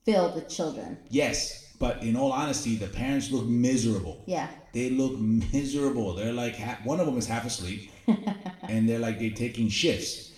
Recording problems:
room echo; slight; dies away in 0.7 s
off-mic speech; somewhat distant

